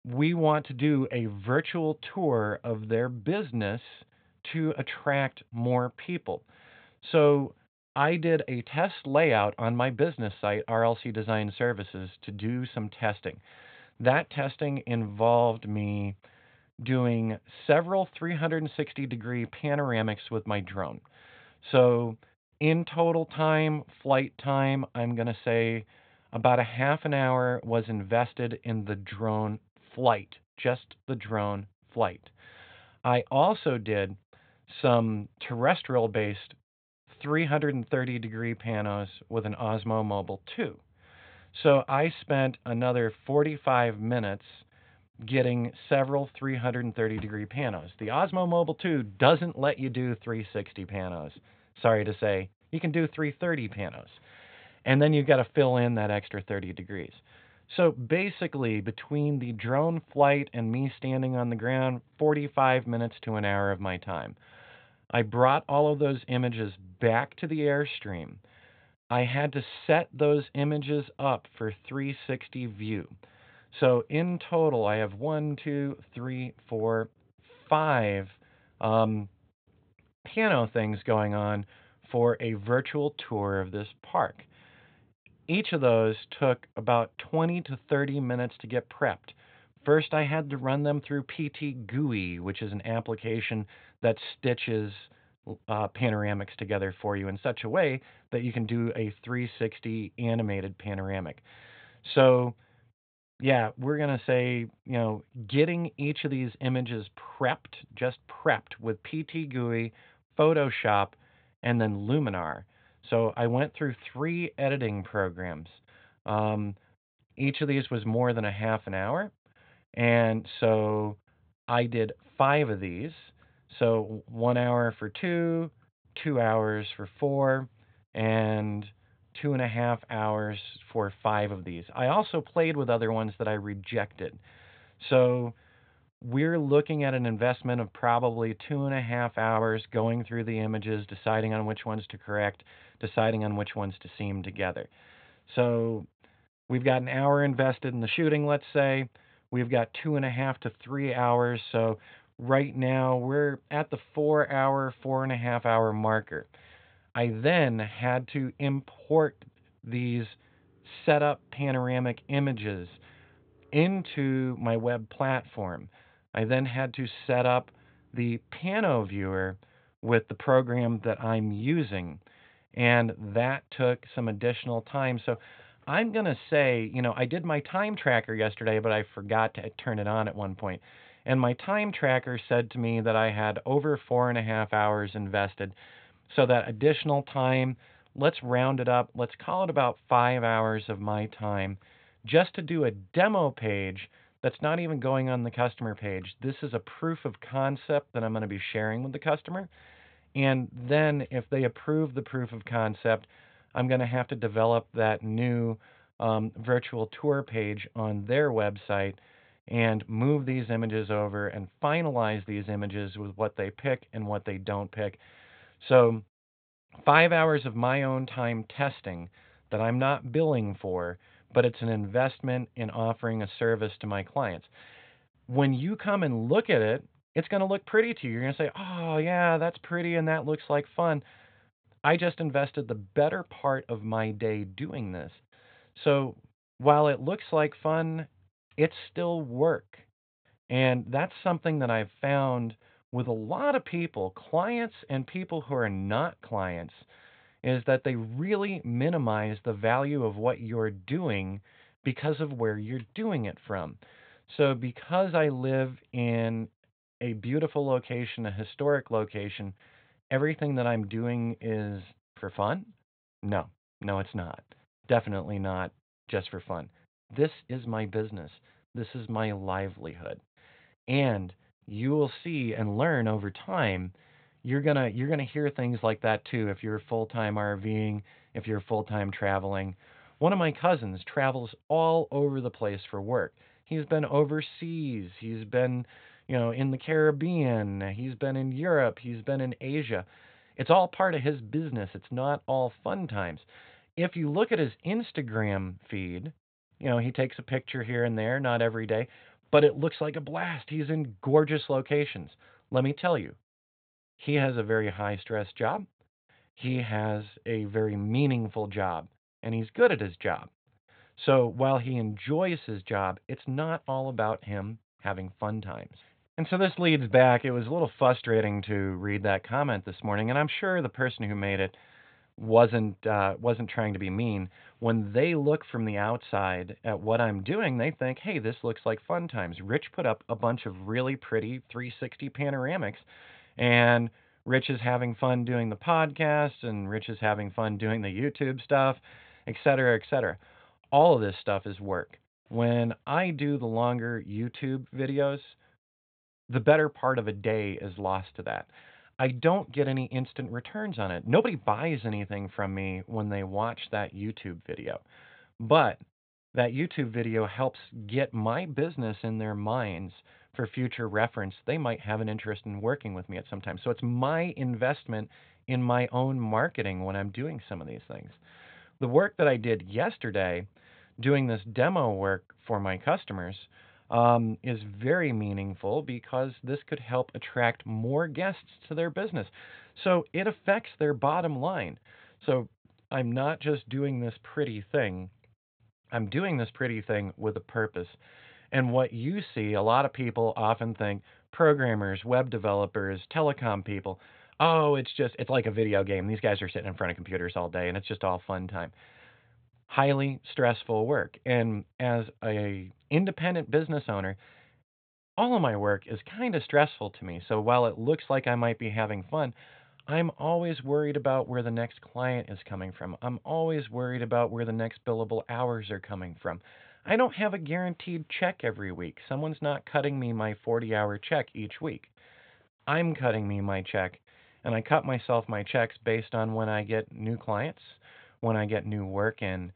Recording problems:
high frequencies cut off; severe; nothing above 4 kHz

